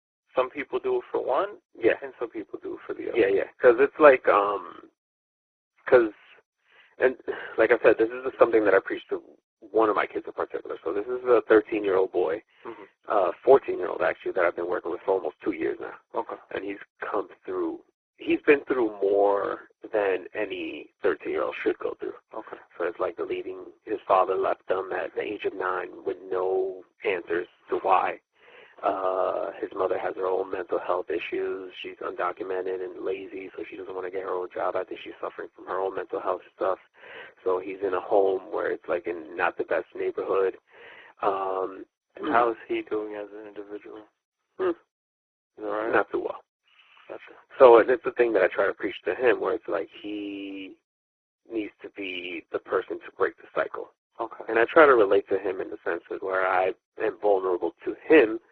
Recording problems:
garbled, watery; badly
phone-call audio

